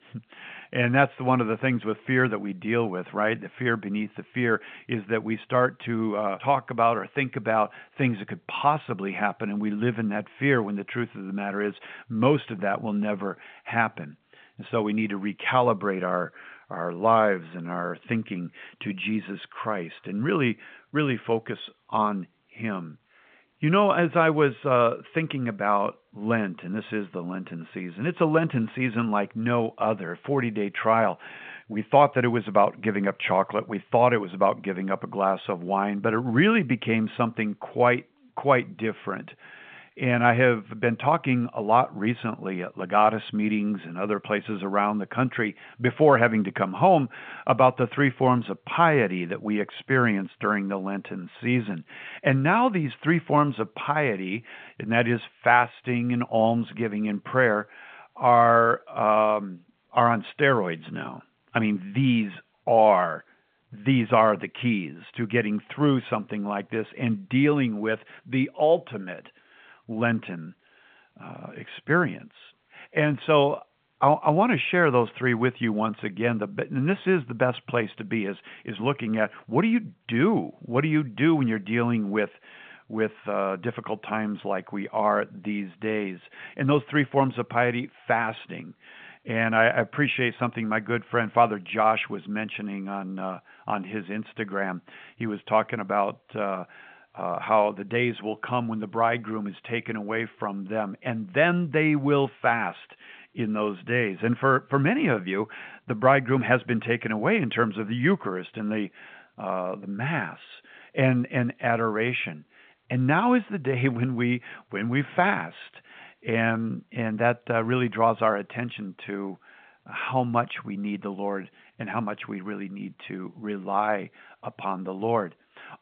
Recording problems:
phone-call audio

